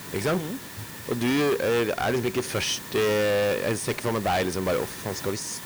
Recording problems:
distortion; heavy; 16% of the sound clipped
hiss; noticeable; throughout; 10 dB below the speech

